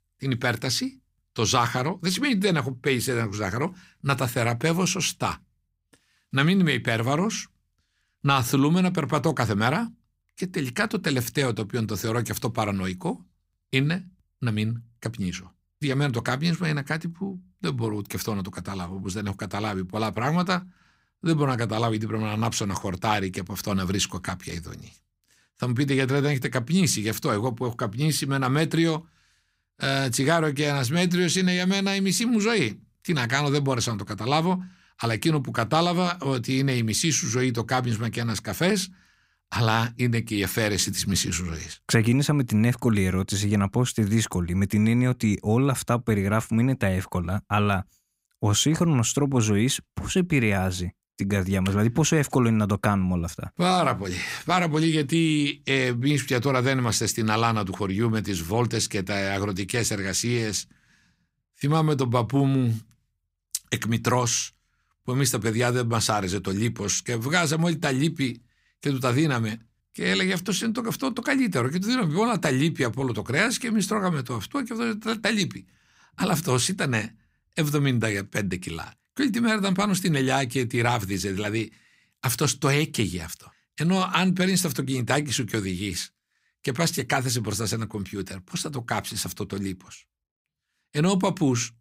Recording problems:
none

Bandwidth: 15.5 kHz